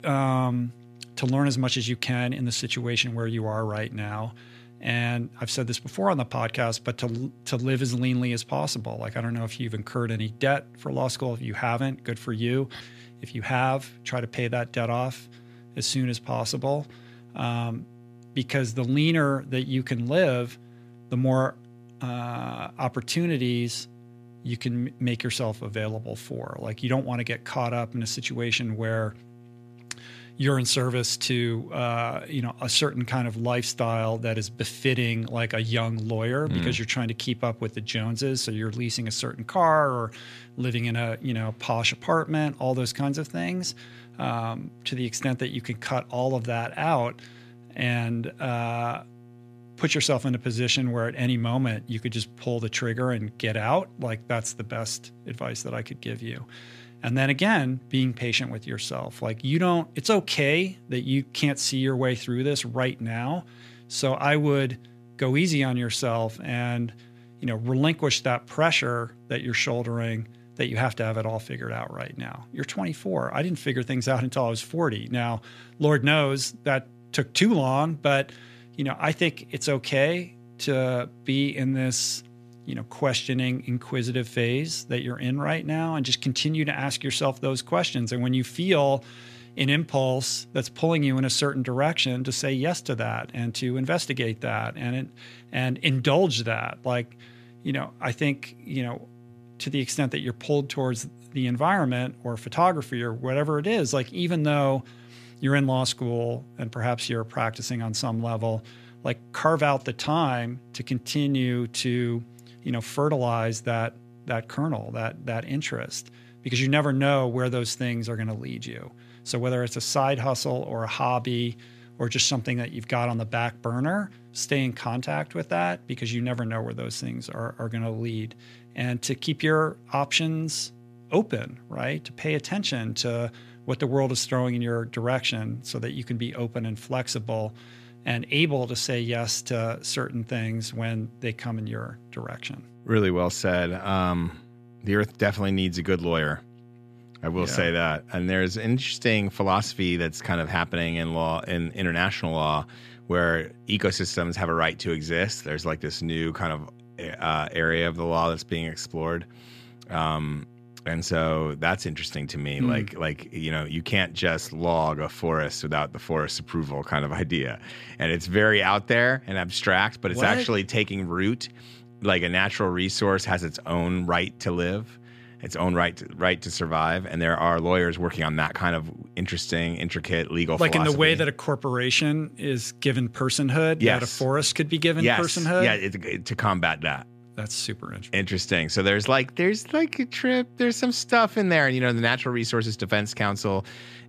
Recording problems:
electrical hum; faint; throughout; 60 Hz, 30 dB below the speech

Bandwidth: 14.5 kHz